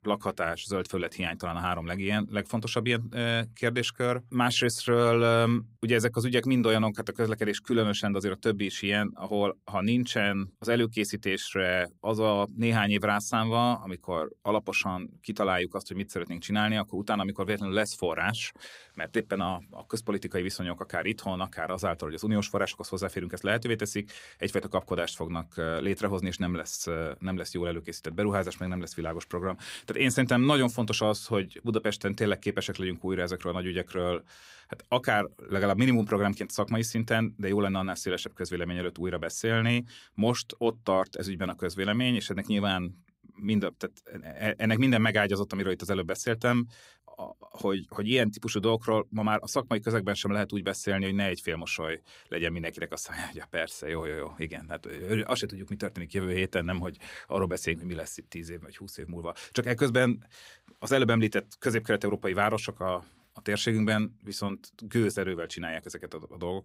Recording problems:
none

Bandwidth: 15.5 kHz